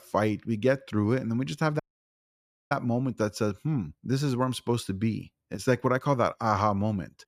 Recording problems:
audio cutting out; at 2 s for 1 s

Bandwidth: 14.5 kHz